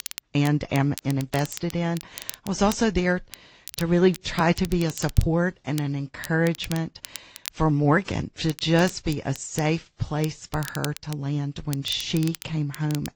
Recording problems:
high frequencies cut off; noticeable; nothing above 8 kHz
garbled, watery; slightly
crackle, like an old record; noticeable; 15 dB below the speech

